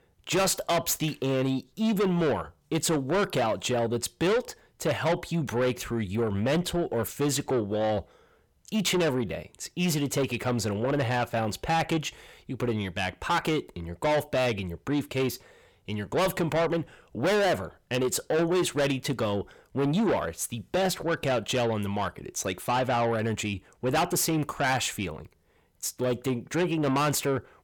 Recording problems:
distortion; heavy; 6 dB below the speech

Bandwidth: 18 kHz